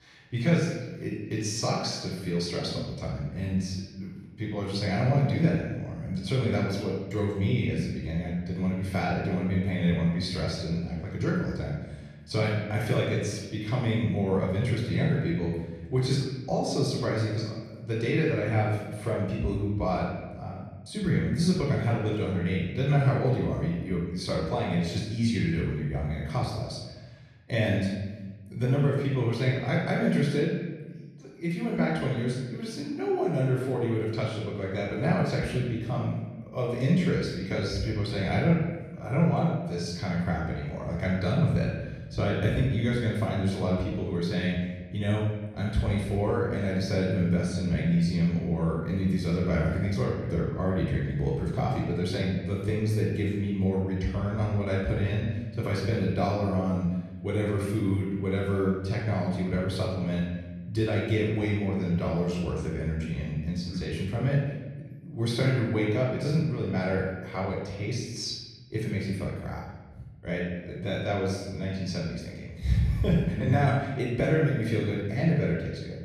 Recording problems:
off-mic speech; far
room echo; noticeable; dies away in 1.2 s

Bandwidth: 14 kHz